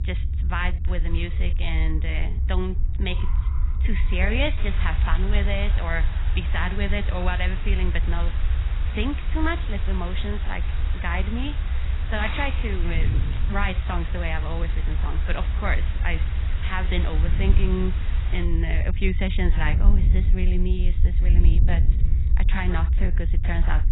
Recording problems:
garbled, watery; badly; nothing above 4 kHz
wind noise on the microphone; occasional gusts; 15 dB below the speech
hiss; noticeable; from 4.5 to 18 s; 10 dB below the speech
low rumble; noticeable; throughout; 15 dB below the speech
traffic noise; faint; throughout; 20 dB below the speech

